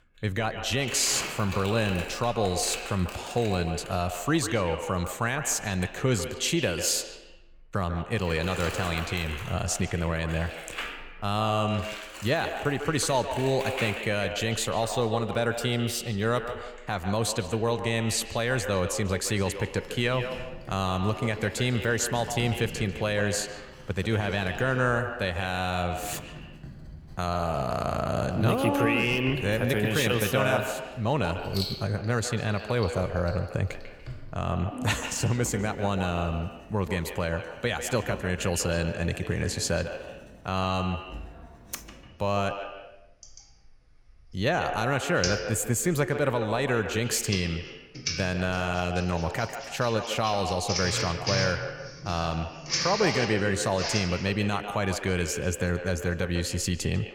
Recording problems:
echo of what is said; strong; throughout; 150 ms later, 9 dB below the speech
household noises; loud; throughout; 10 dB below the speech

